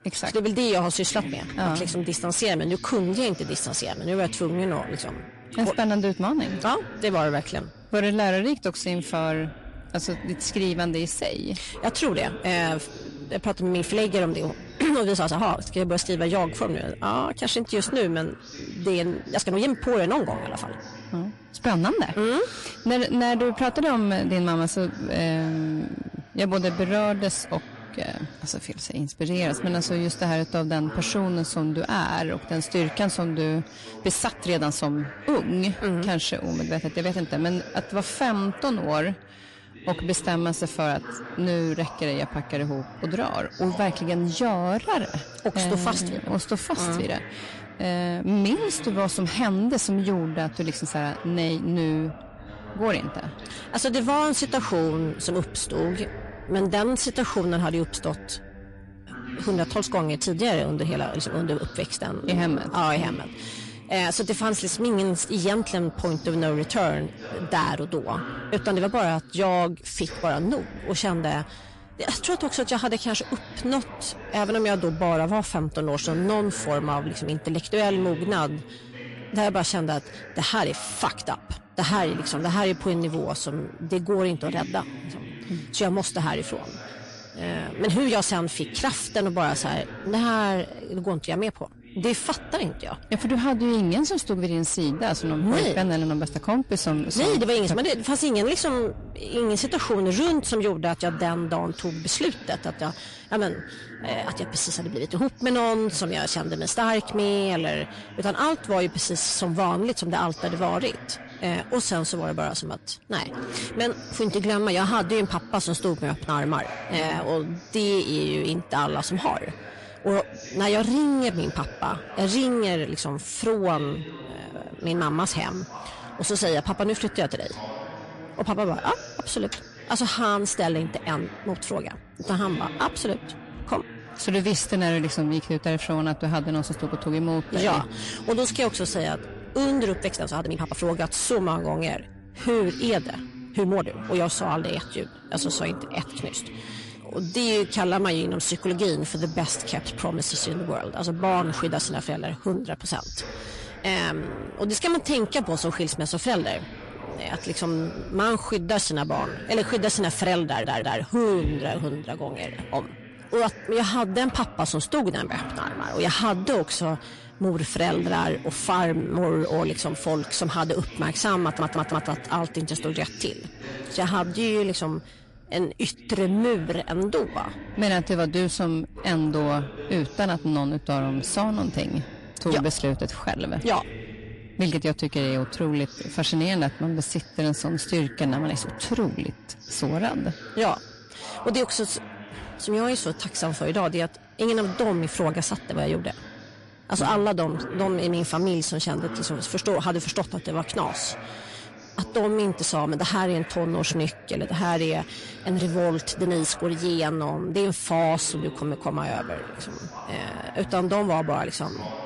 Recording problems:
distortion; slight; 10 dB below the speech
garbled, watery; slightly
voice in the background; noticeable; throughout; 15 dB below the speech
uneven, jittery; strongly; from 15 s to 3:08
audio stuttering; at 2:40 and at 2:51

